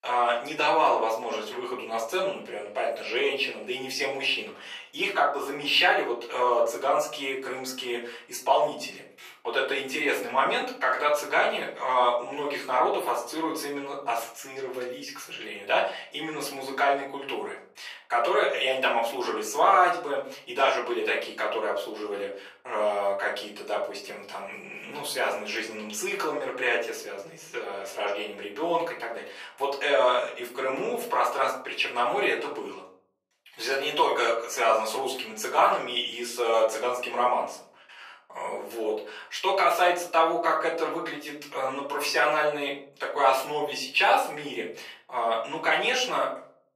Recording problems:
off-mic speech; far
thin; very; fading below 550 Hz
room echo; slight; dies away in 0.5 s

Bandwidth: 14.5 kHz